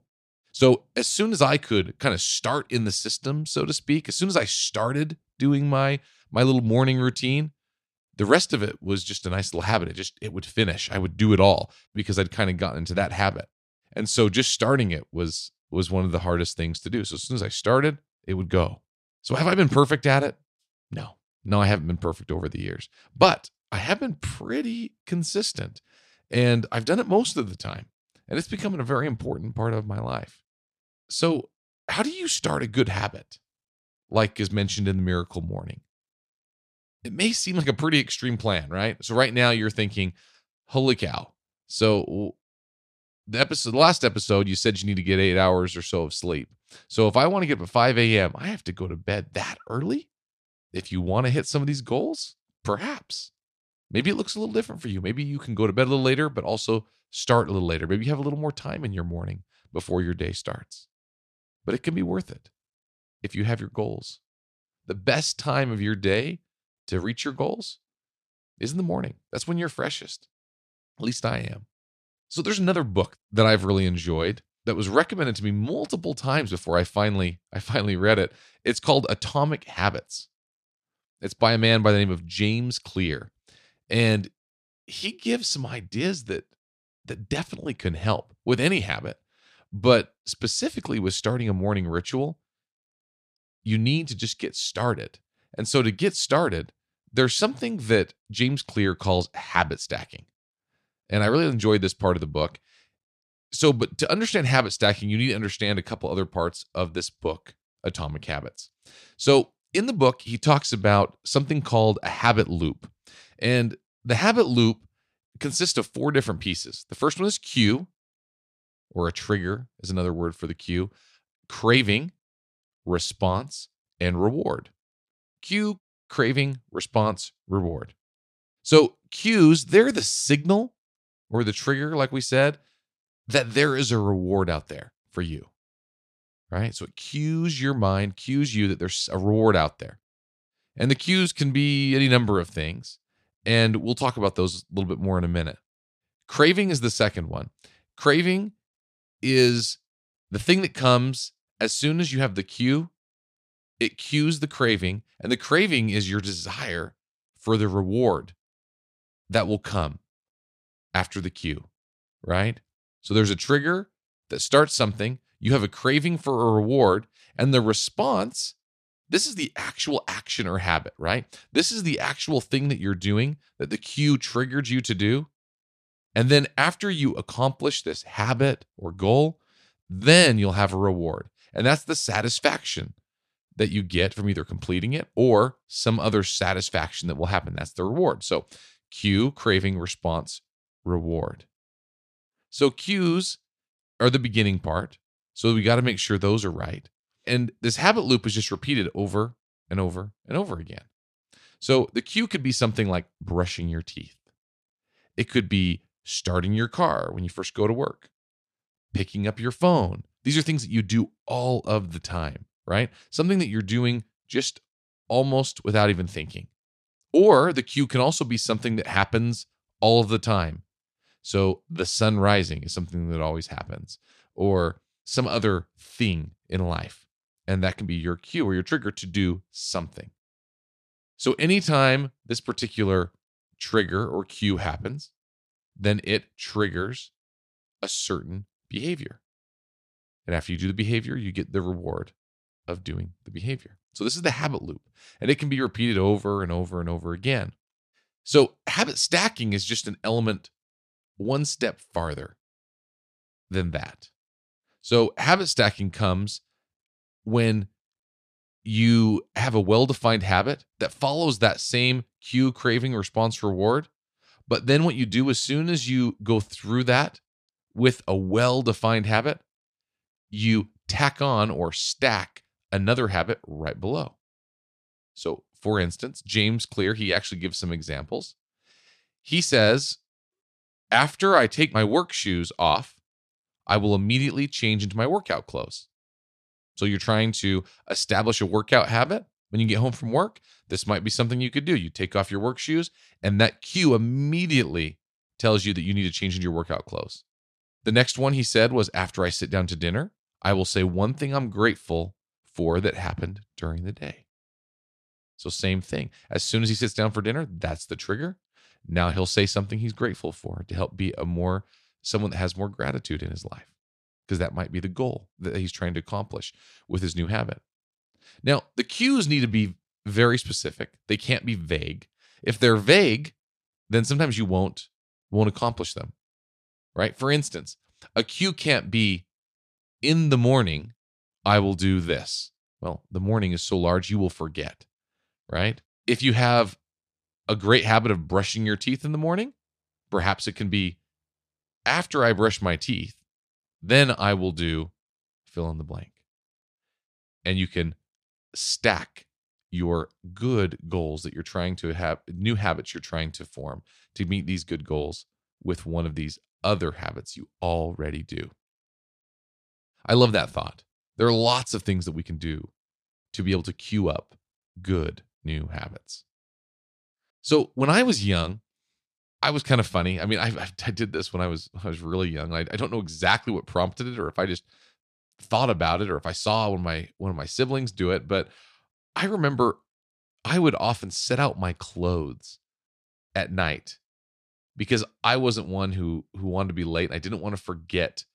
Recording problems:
none

